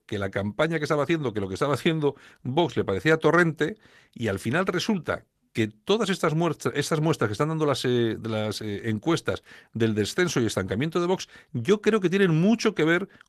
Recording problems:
garbled, watery; slightly; nothing above 13.5 kHz

